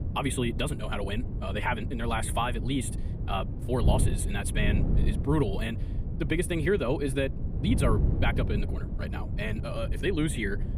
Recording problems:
wrong speed, natural pitch; too fast; 1.5 times normal speed
wind noise on the microphone; occasional gusts; 10 dB below the speech

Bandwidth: 15 kHz